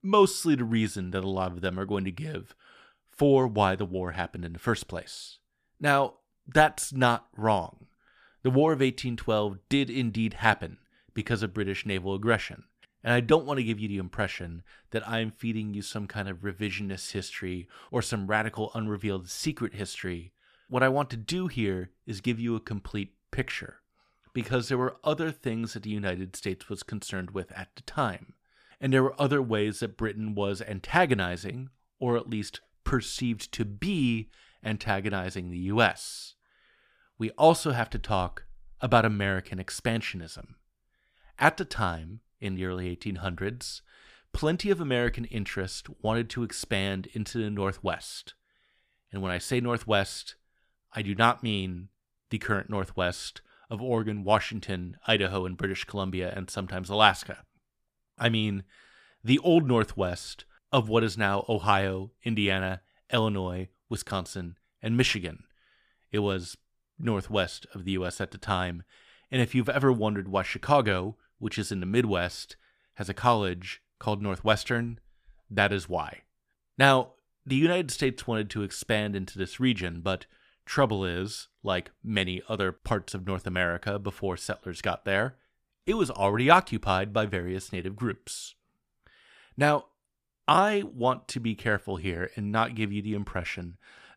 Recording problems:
none

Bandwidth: 14.5 kHz